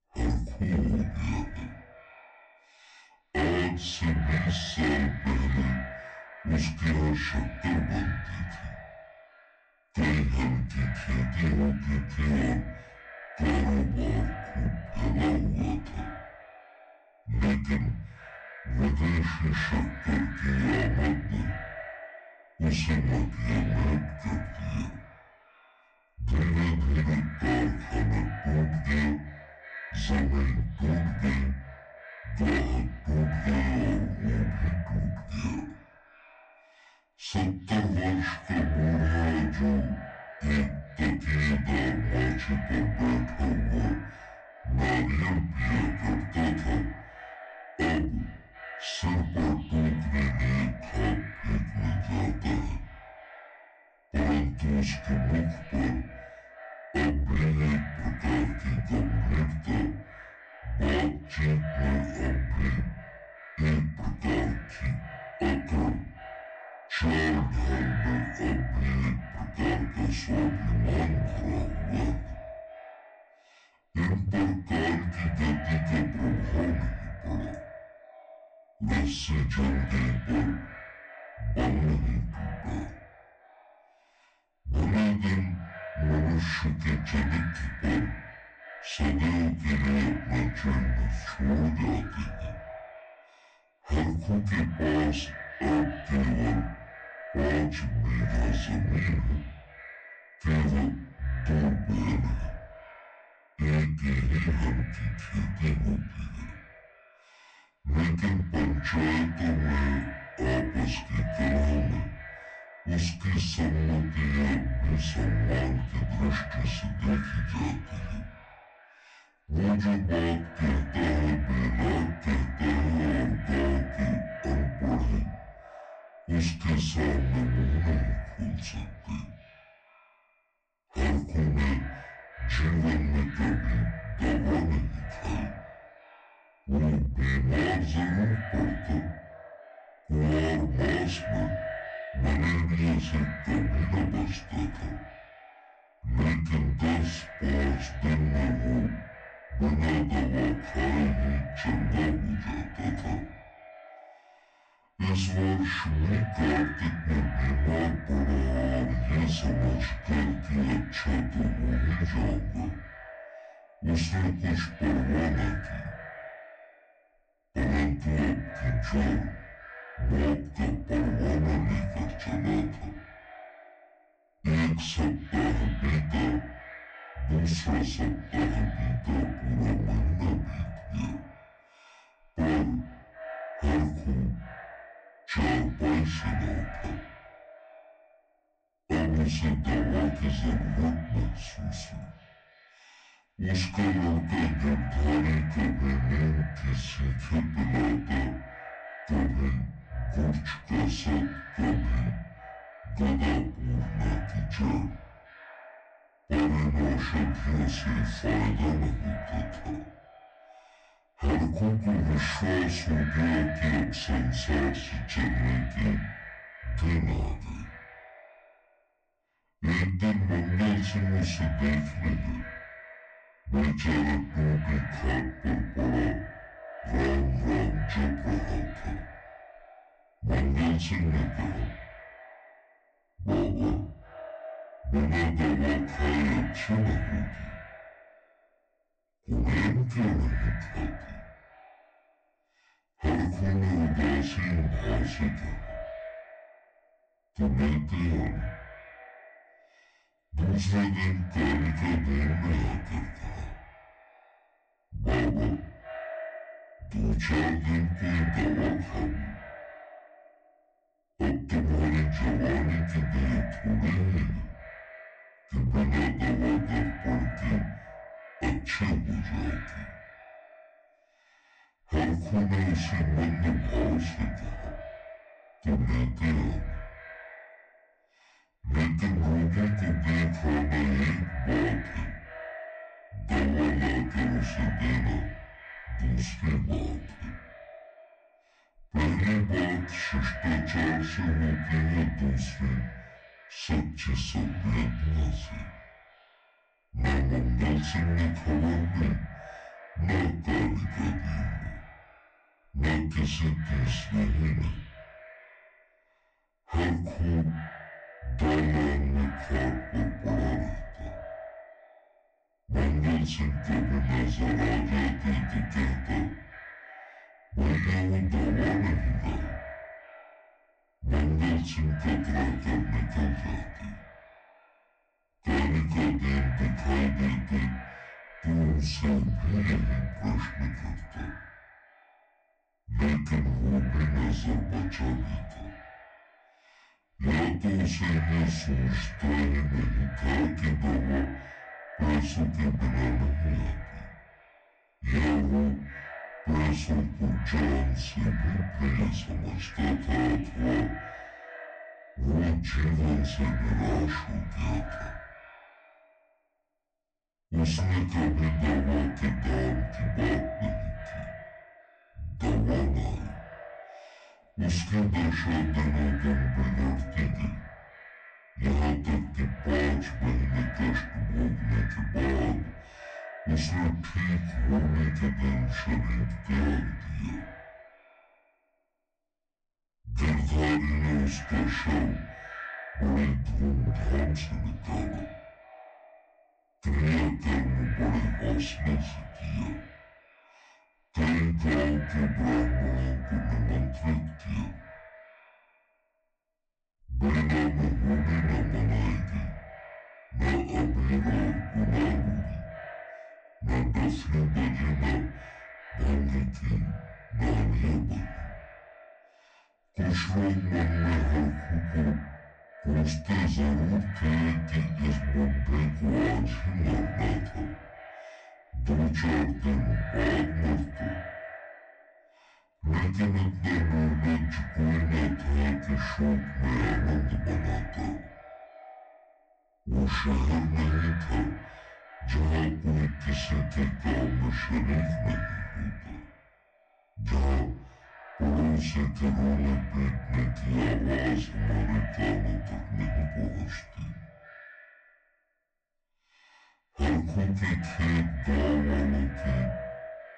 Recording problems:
off-mic speech; far
wrong speed and pitch; too slow and too low; 0.5 times normal speed
echo of what is said; noticeable; throughout; 360 ms later, 15 dB below the speech
distortion; slight; 10% of the sound clipped
room echo; very slight; dies away in 0.3 s

